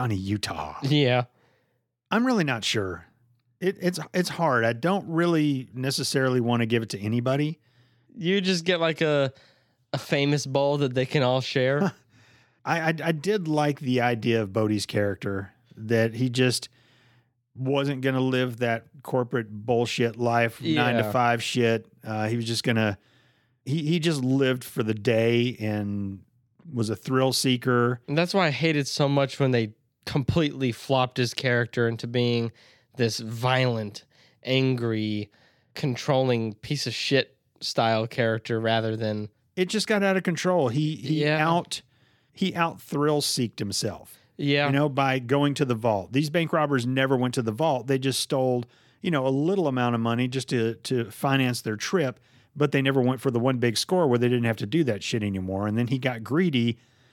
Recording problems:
abrupt cut into speech; at the start

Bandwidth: 17.5 kHz